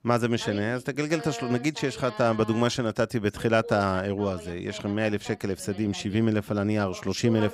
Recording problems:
voice in the background; noticeable; throughout; 15 dB below the speech

